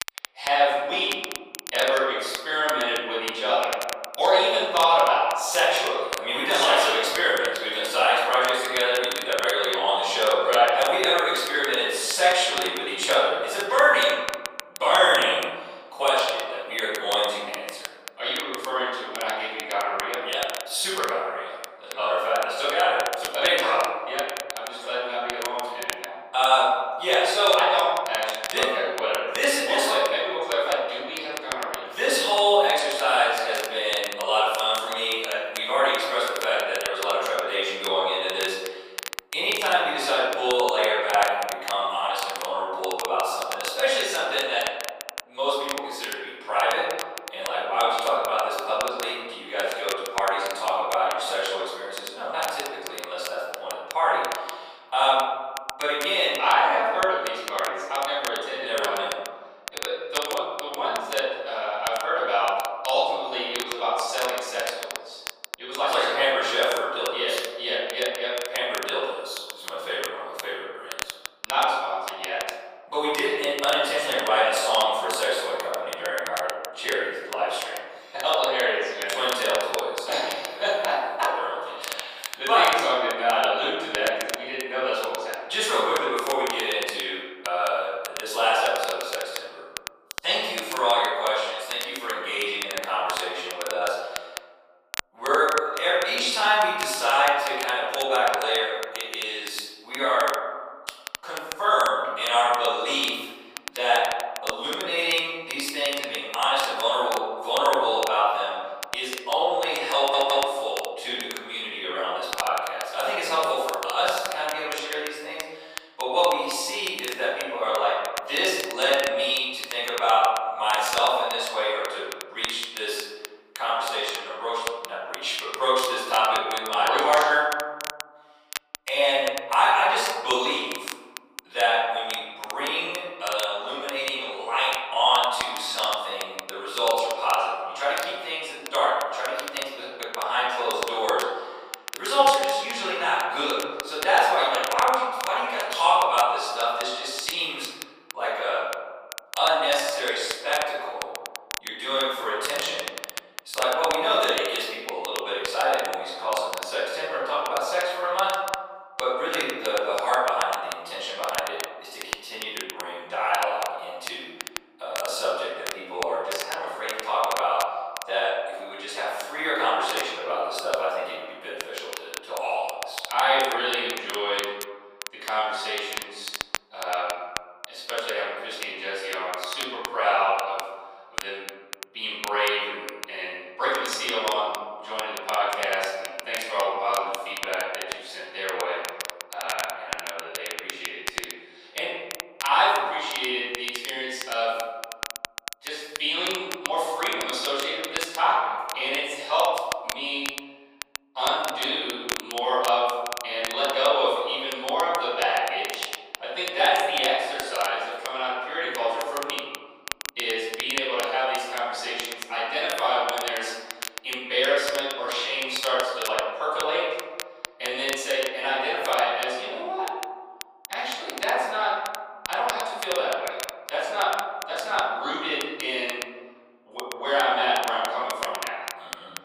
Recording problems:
room echo; strong; dies away in 1.4 s
off-mic speech; far
thin; very; fading below 550 Hz
crackle, like an old record; noticeable; 10 dB below the speech
audio stuttering; at 1:50

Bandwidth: 15 kHz